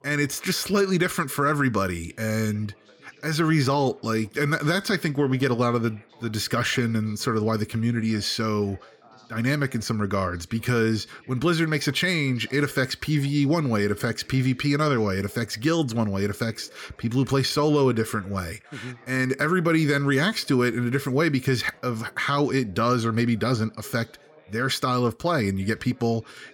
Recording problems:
background chatter; faint; throughout; 2 voices, 30 dB below the speech

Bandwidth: 17.5 kHz